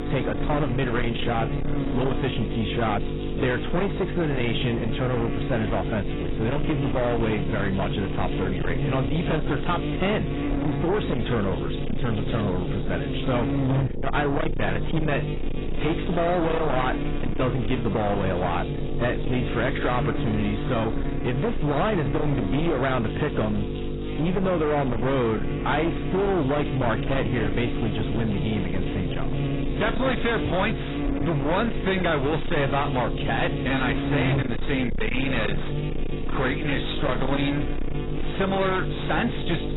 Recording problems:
distortion; heavy; 8 dB below the speech
garbled, watery; badly; nothing above 4 kHz
electrical hum; loud; throughout; 50 Hz, 6 dB below the speech

